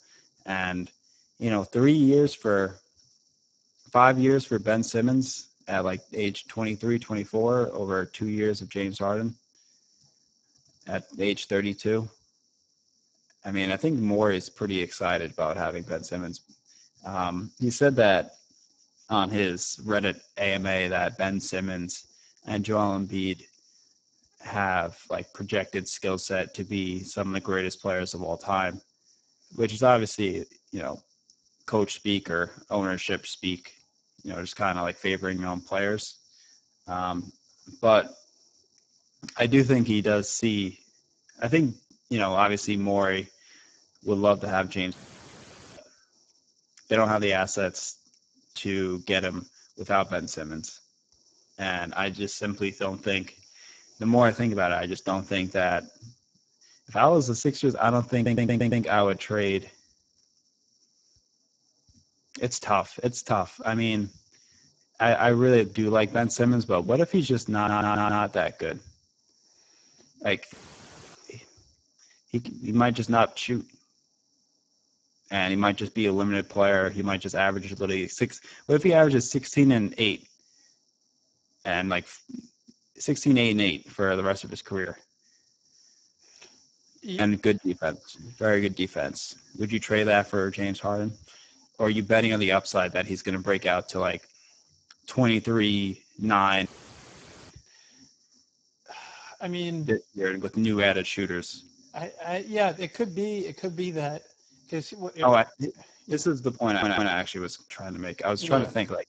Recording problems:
garbled, watery; badly; nothing above 7.5 kHz
high-pitched whine; very faint; throughout; 5.5 kHz, 60 dB below the speech
audio cutting out; at 45 s for 1 s, at 1:11 for 0.5 s and at 1:37 for 1 s
audio stuttering; at 58 s, at 1:08 and at 1:47

